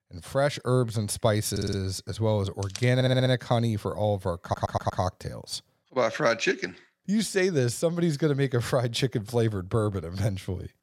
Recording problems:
audio stuttering; at 1.5 s, at 3 s and at 4.5 s

